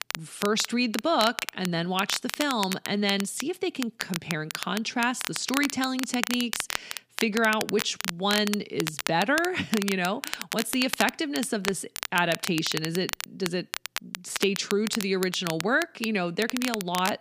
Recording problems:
crackle, like an old record; loud; 6 dB below the speech

